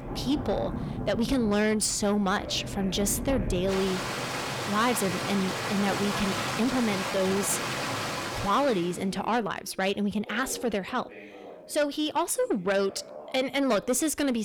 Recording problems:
distortion; slight; 10 dB below the speech
rain or running water; loud; until 8.5 s; 4 dB below the speech
background chatter; noticeable; throughout; 2 voices, 20 dB below the speech
uneven, jittery; strongly; from 1 to 14 s
abrupt cut into speech; at the end

